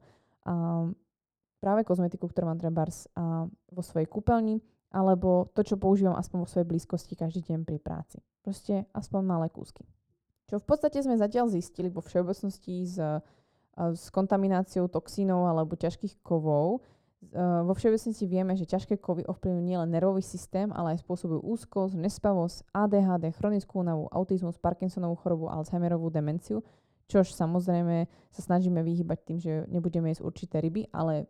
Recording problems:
muffled; very; fading above 1.5 kHz

